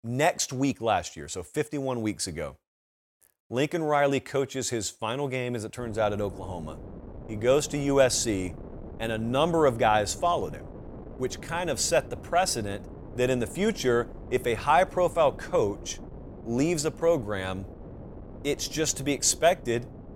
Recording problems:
wind noise on the microphone; occasional gusts; from 6 s on; 20 dB below the speech

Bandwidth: 16.5 kHz